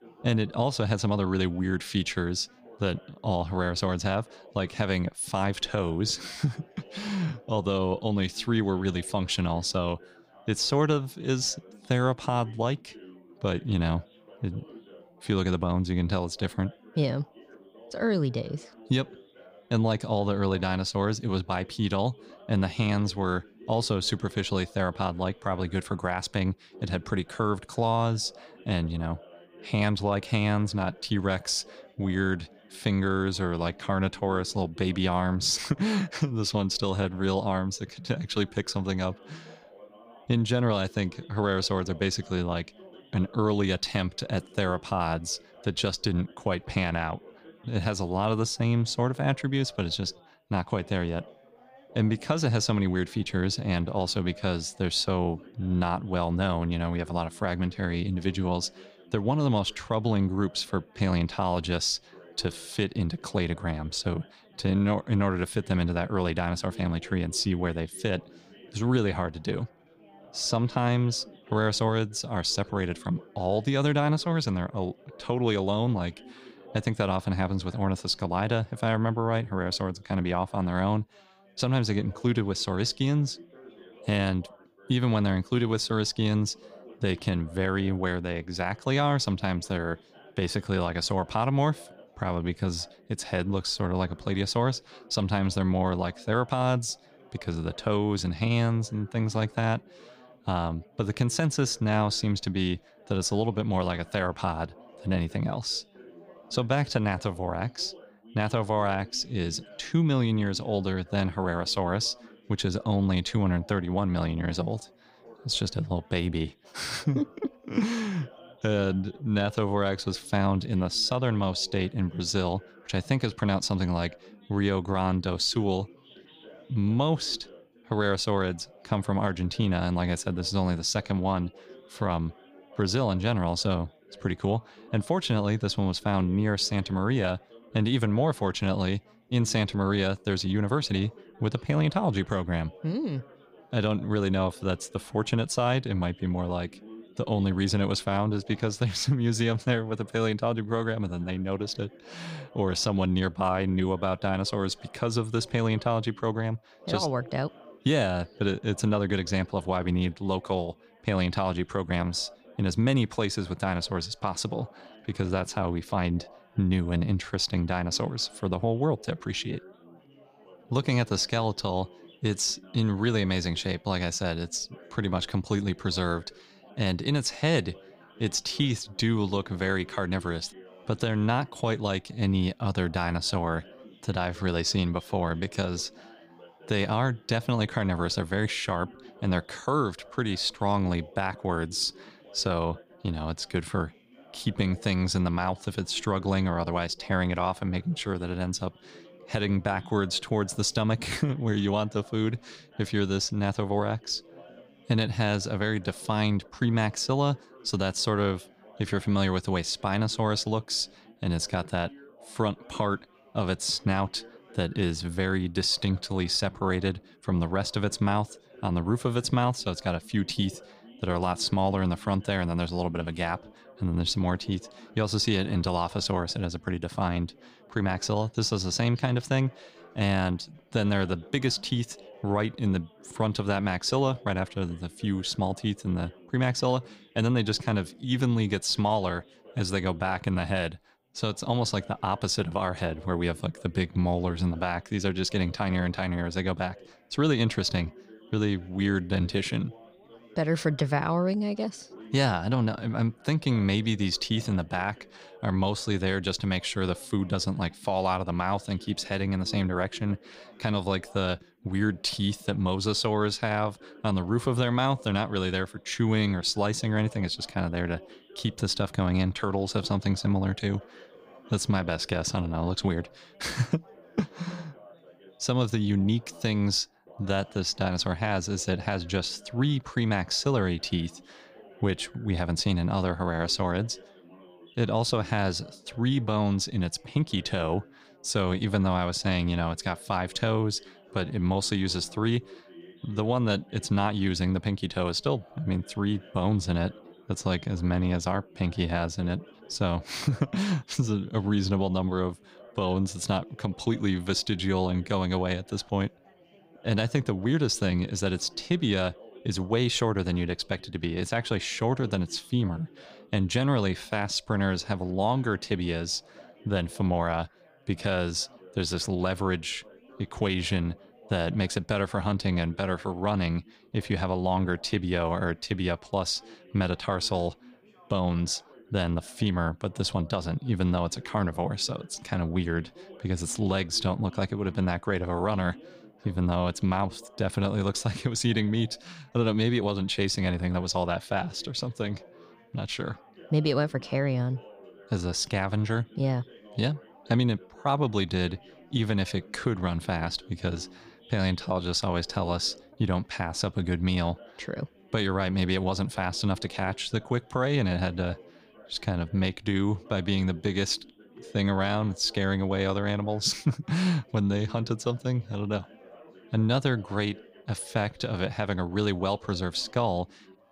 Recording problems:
background chatter; faint; throughout; 4 voices, 25 dB below the speech

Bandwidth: 15.5 kHz